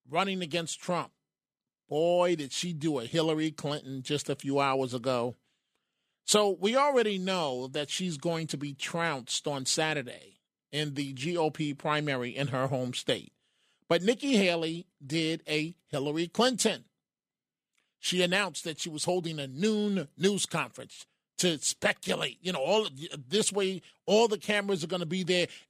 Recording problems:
none

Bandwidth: 14.5 kHz